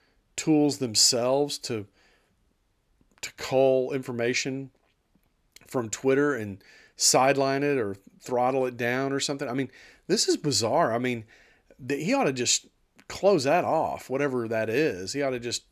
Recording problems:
none

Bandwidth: 14 kHz